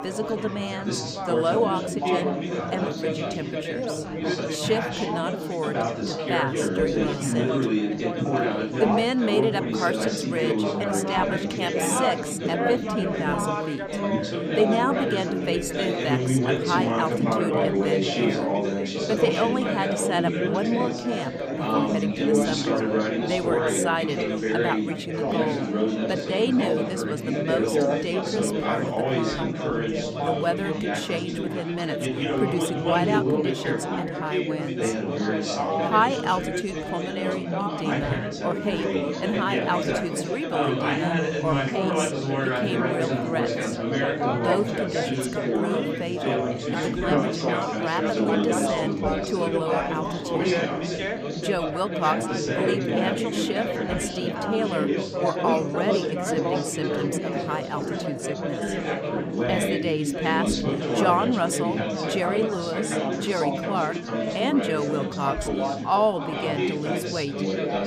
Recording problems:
chatter from many people; very loud; throughout; 2 dB above the speech

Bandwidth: 15.5 kHz